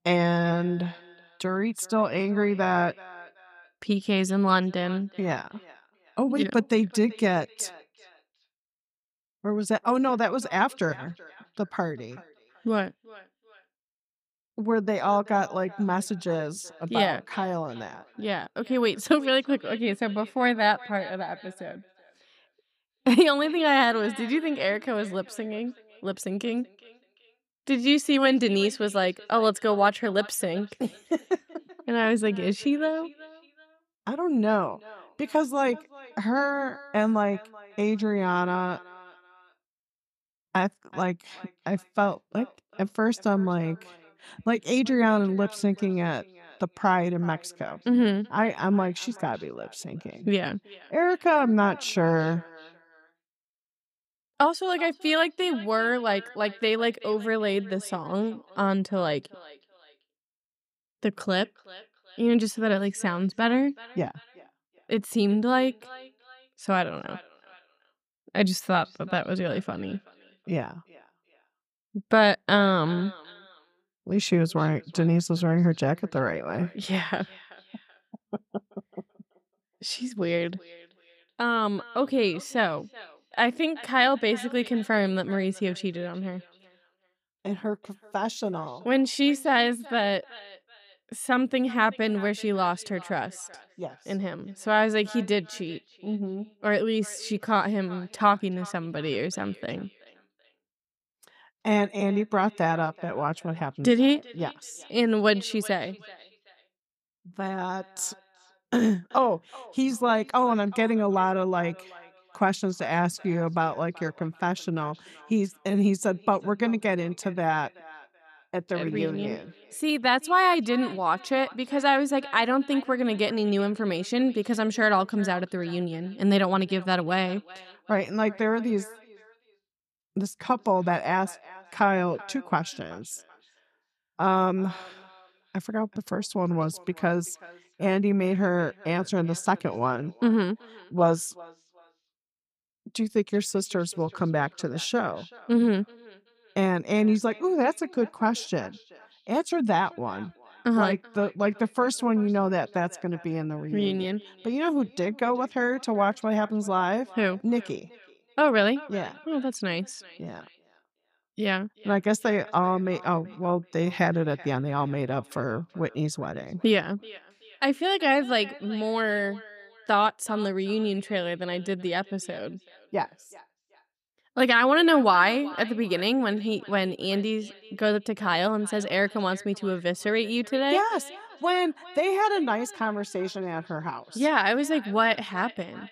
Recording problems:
echo of what is said; faint; throughout; 380 ms later, 20 dB below the speech

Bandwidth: 15 kHz